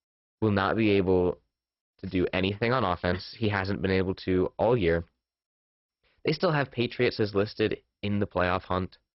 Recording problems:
garbled, watery; badly; nothing above 5.5 kHz

